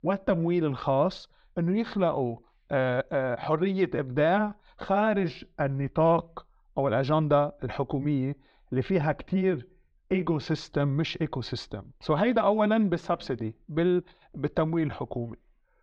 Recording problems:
muffled; slightly; fading above 4 kHz

